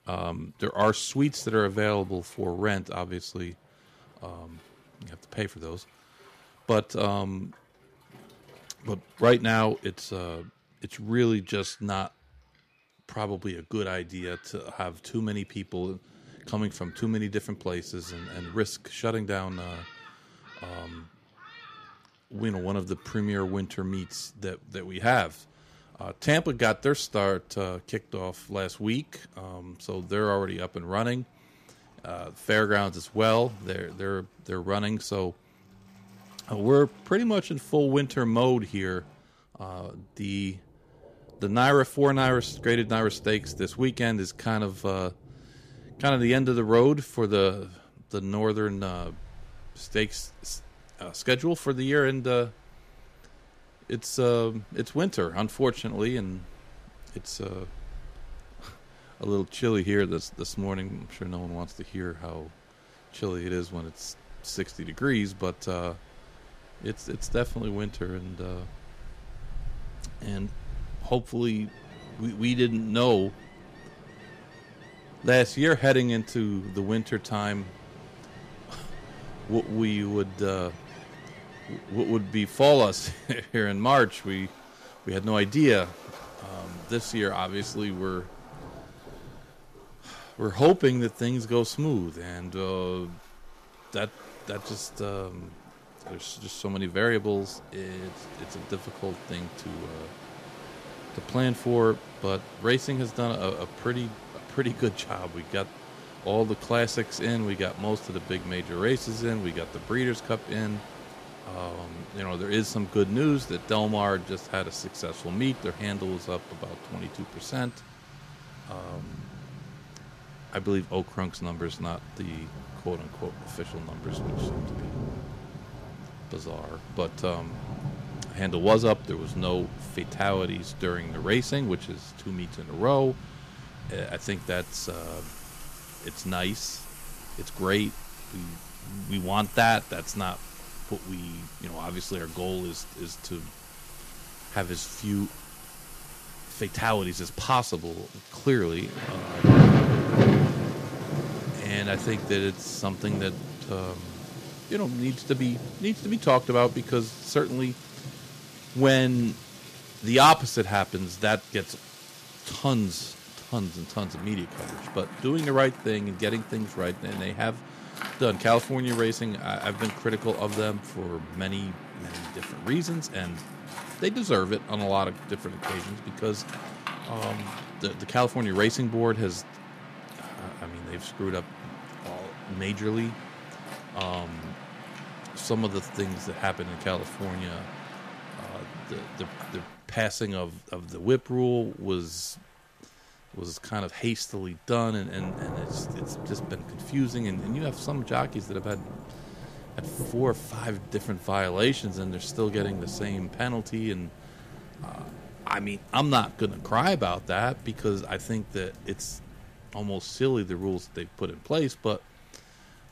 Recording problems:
rain or running water; loud; throughout; 8 dB below the speech

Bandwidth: 14.5 kHz